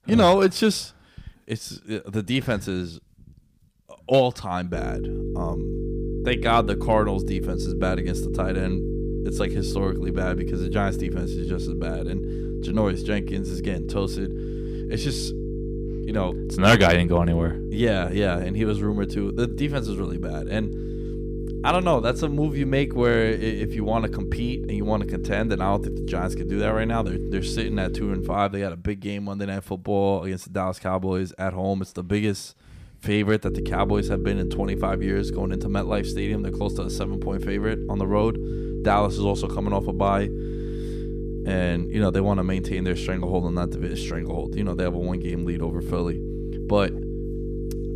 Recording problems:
electrical hum; loud; from 4.5 to 28 s and from 33 s on; 50 Hz, 9 dB below the speech

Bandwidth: 15 kHz